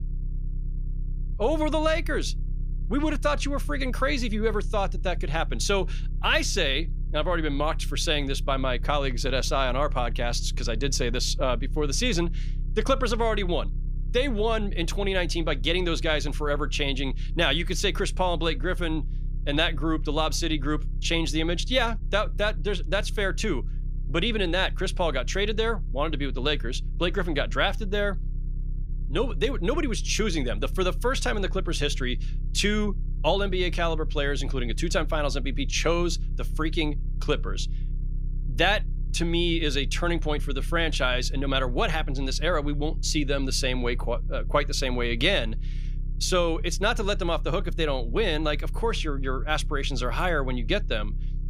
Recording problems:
low rumble; faint; throughout; 25 dB below the speech

